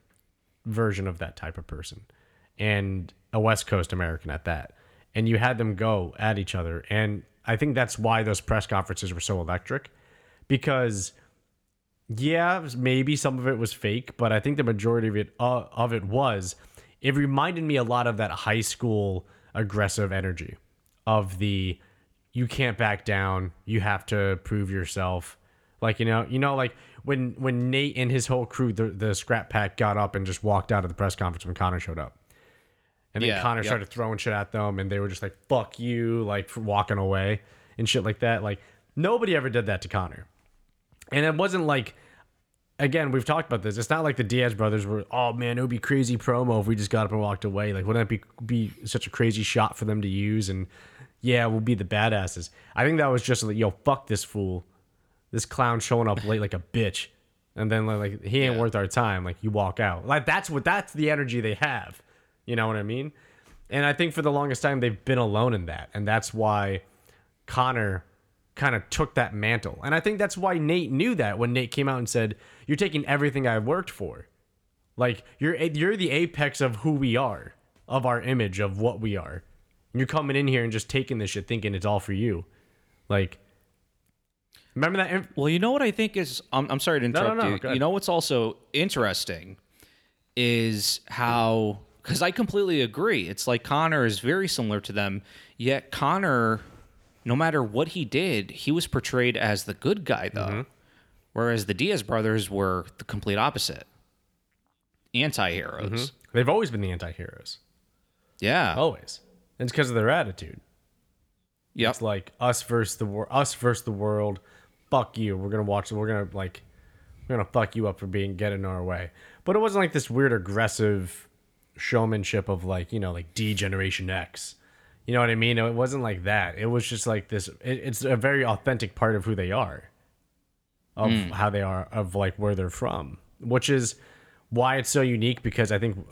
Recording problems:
none

